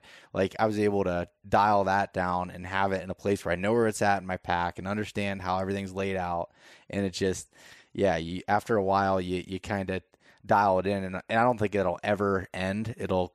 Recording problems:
none

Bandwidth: 14 kHz